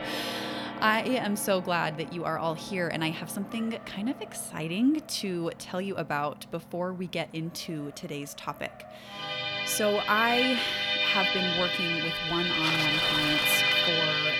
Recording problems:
background music; very loud; throughout; 4 dB above the speech
traffic noise; loud; throughout; 9 dB below the speech

